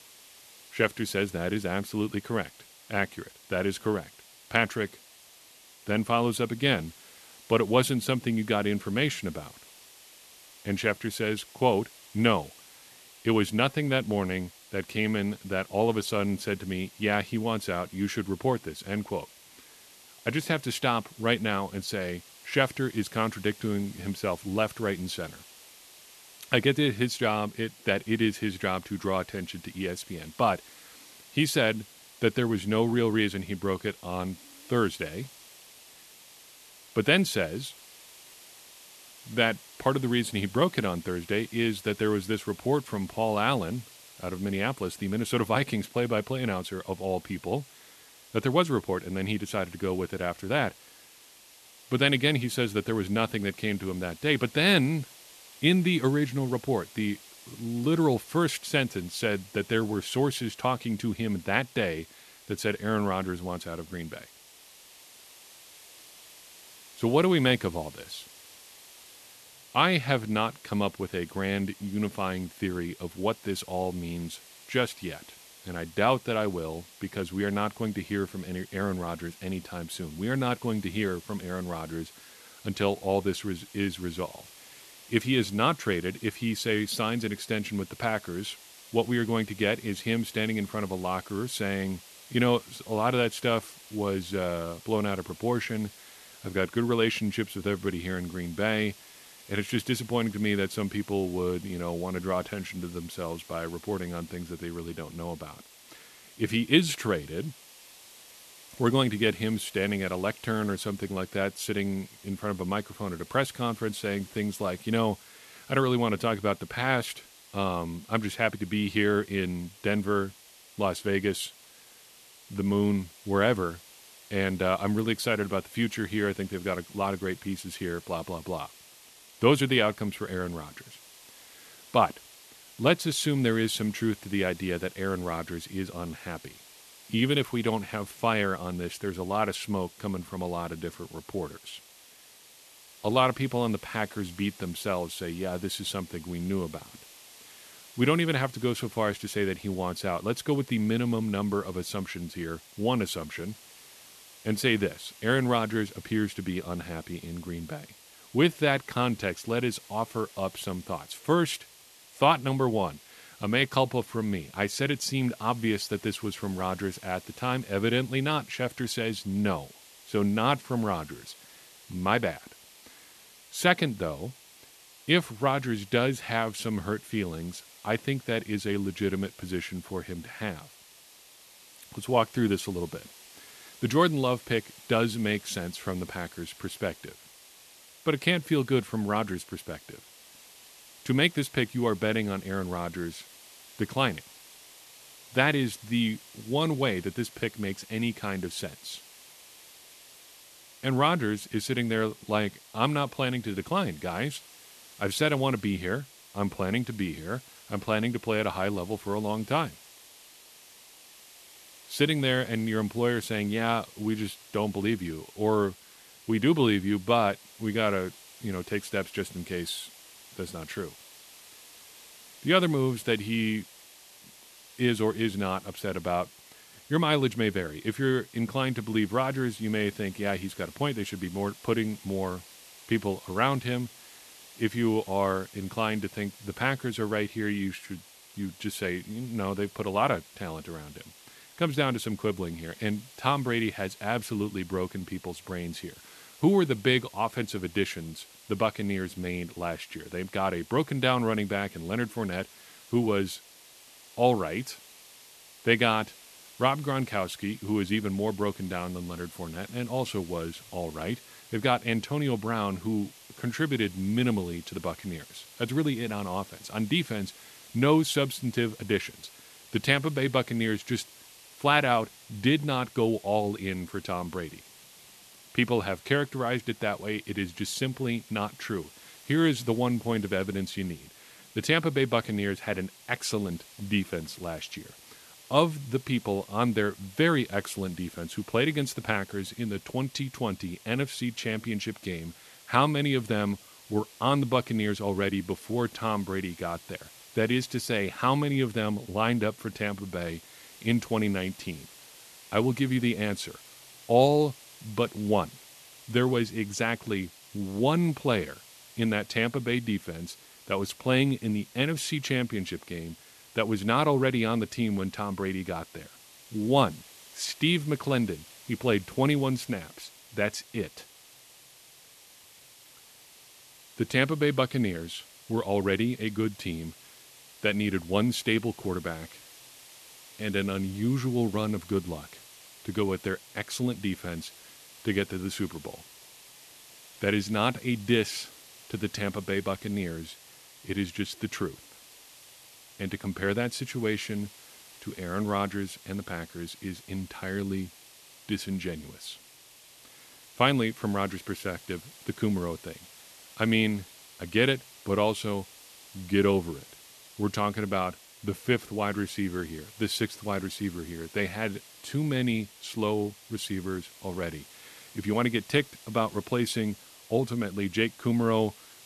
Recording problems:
hiss; faint; throughout; 20 dB below the speech

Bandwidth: 13.5 kHz